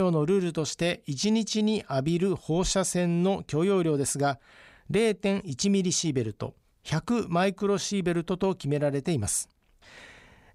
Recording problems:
abrupt cut into speech; at the start

